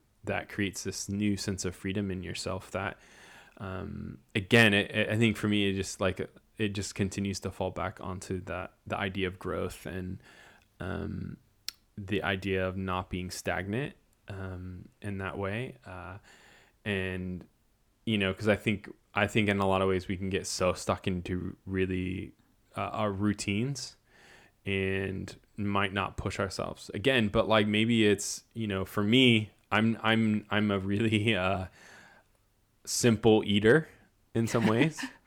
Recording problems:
none

